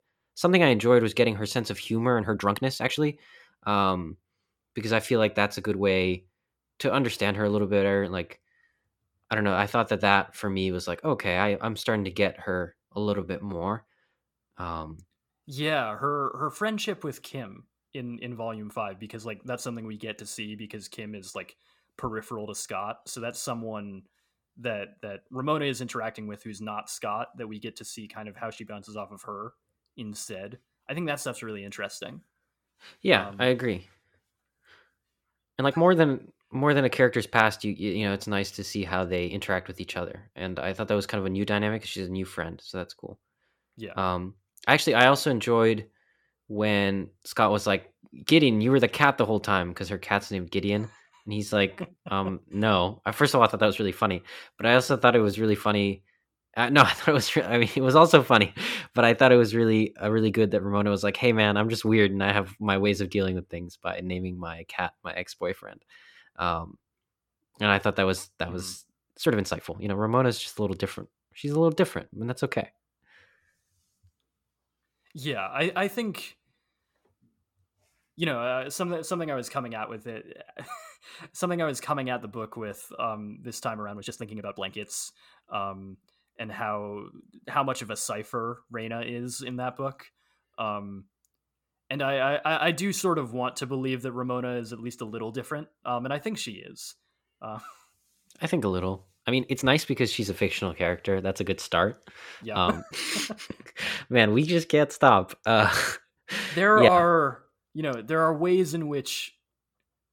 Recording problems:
uneven, jittery; strongly; from 2 s to 1:44

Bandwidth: 17.5 kHz